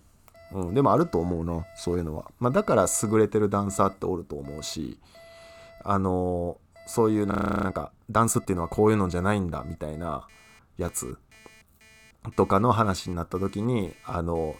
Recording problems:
alarms or sirens; faint; throughout; 25 dB below the speech
audio freezing; at 7.5 s

